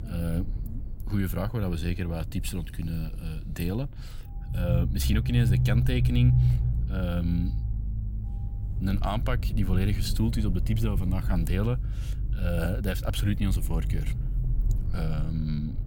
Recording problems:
low rumble; loud; throughout; 8 dB below the speech

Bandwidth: 16.5 kHz